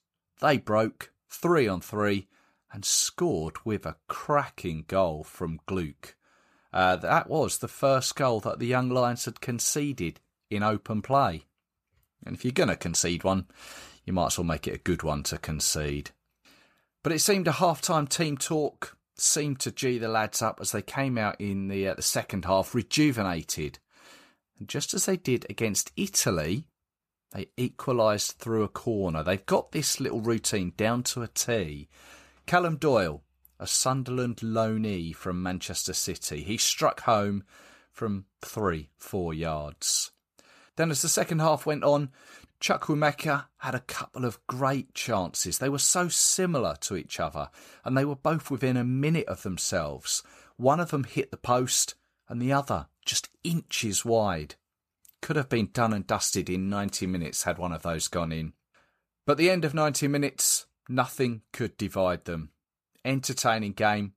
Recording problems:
none

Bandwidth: 14.5 kHz